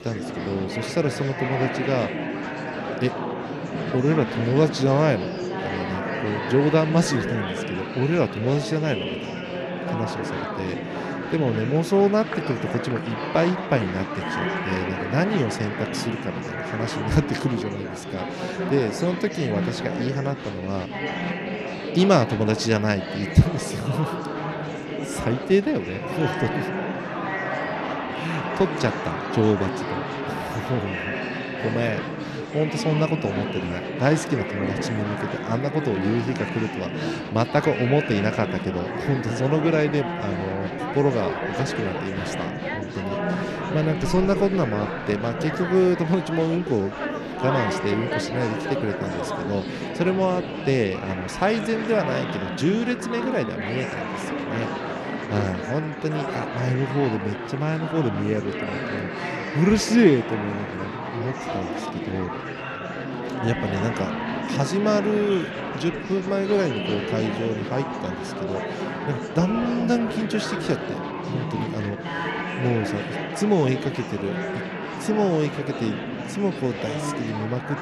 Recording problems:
murmuring crowd; loud; throughout; 4 dB below the speech

